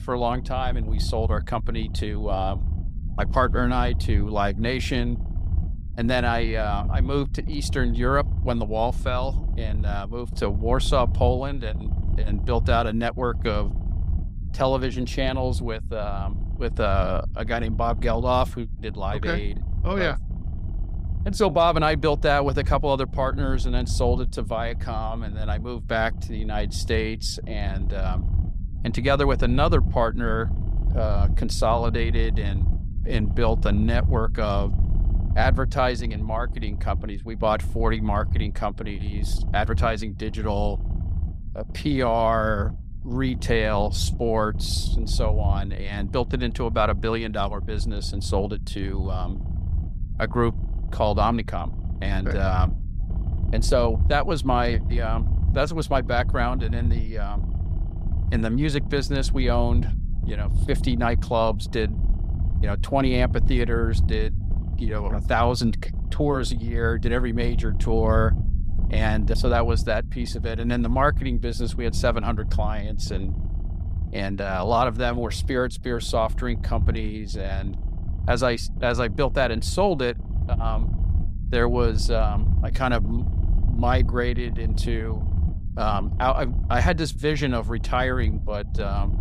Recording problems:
low rumble; noticeable; throughout; 20 dB below the speech

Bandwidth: 15.5 kHz